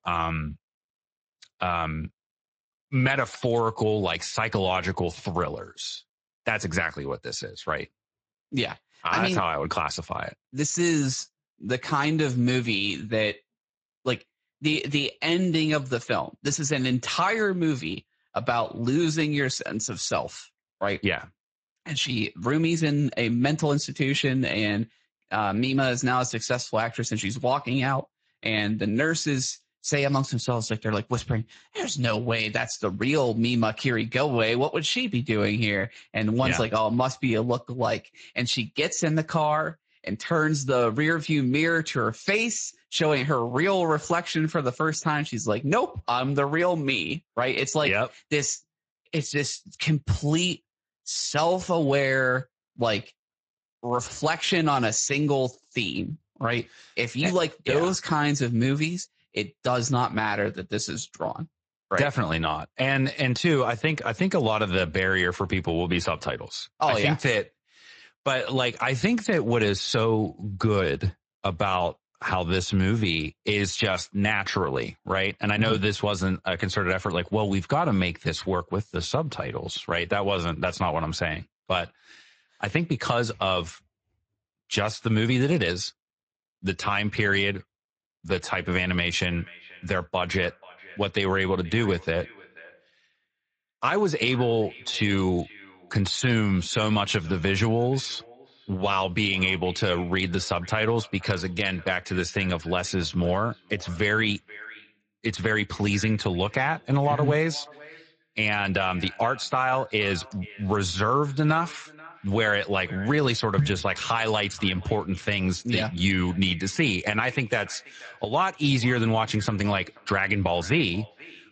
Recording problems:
echo of what is said; faint; from 1:29 on; 480 ms later, 20 dB below the speech
garbled, watery; slightly; nothing above 7.5 kHz

